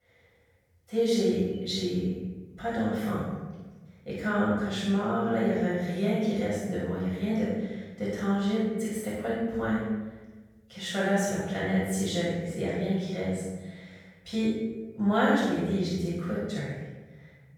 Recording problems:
room echo; strong; dies away in 1.1 s
off-mic speech; far

